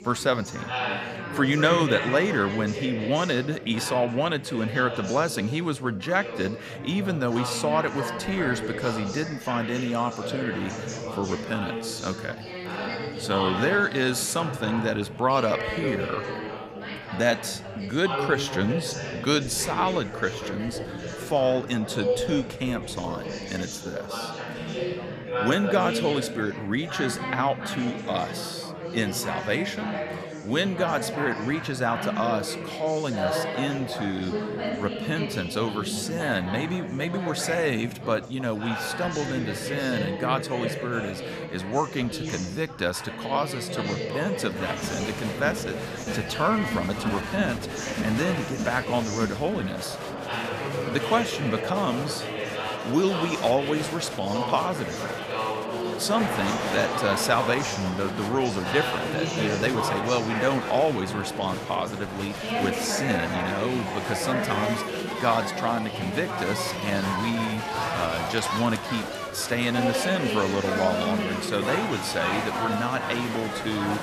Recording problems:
chatter from many people; loud; throughout; 3 dB below the speech

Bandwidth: 14.5 kHz